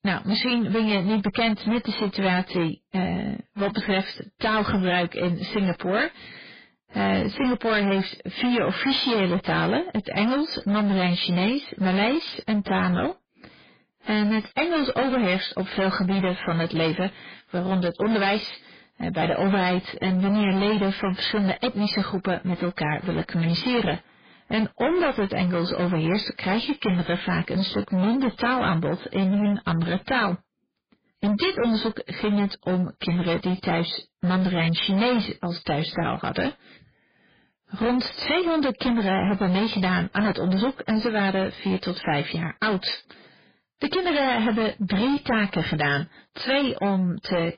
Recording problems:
distortion; heavy; 22% of the sound clipped
garbled, watery; badly; nothing above 4 kHz

